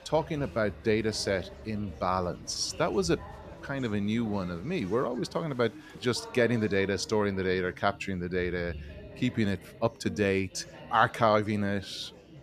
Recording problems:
chatter from many people; noticeable; throughout; 15 dB below the speech

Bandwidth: 14.5 kHz